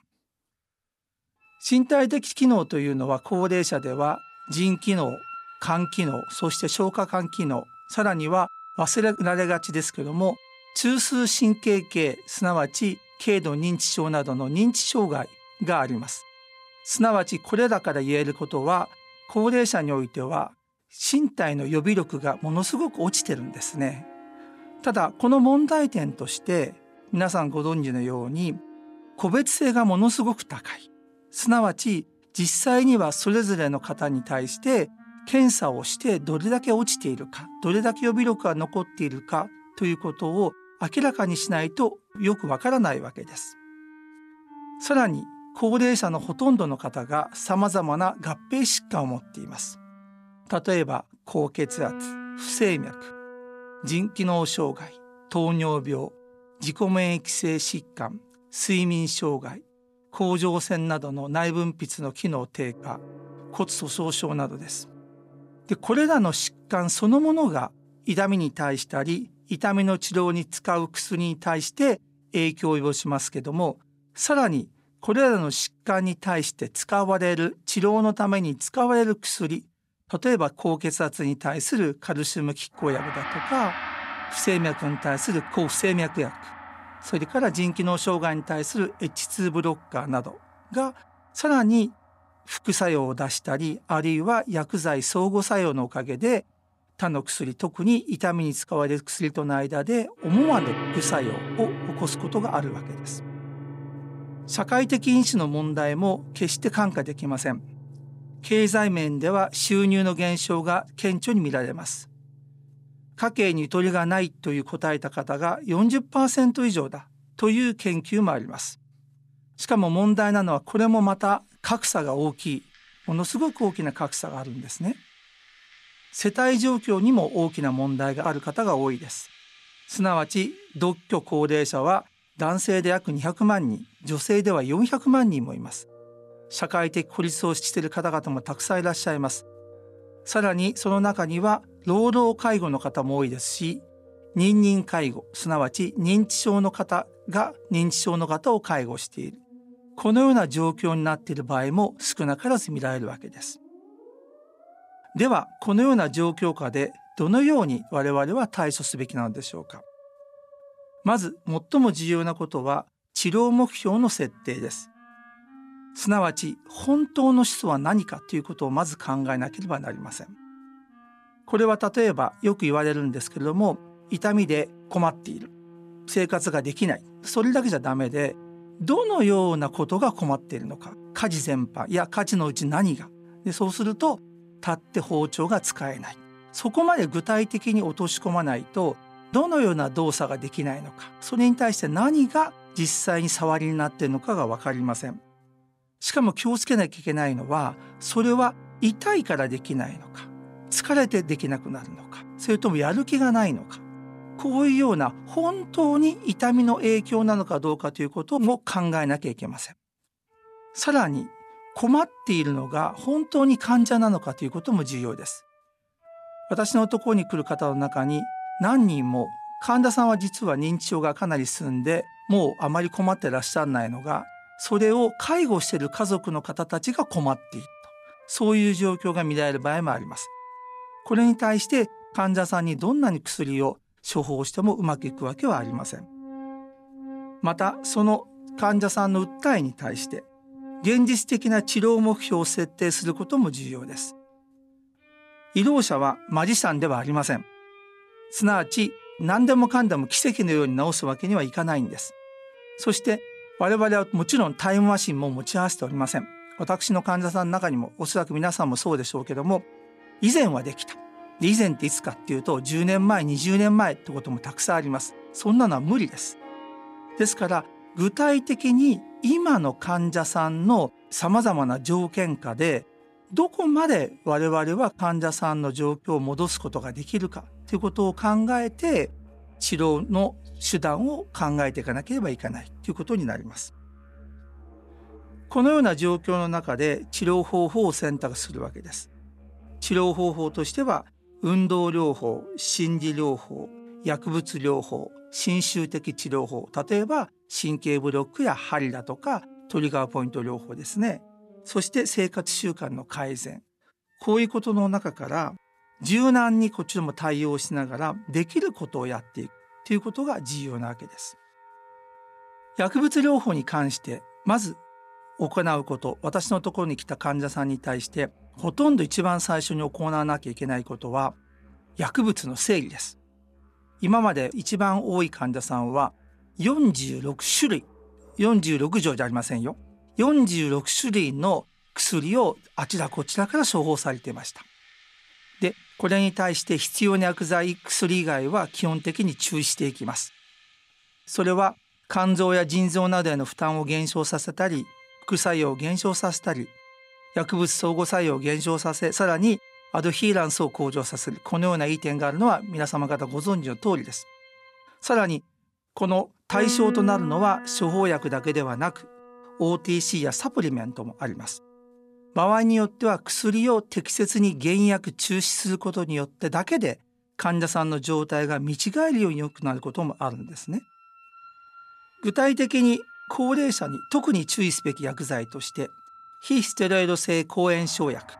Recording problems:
background music; noticeable; throughout; 20 dB below the speech

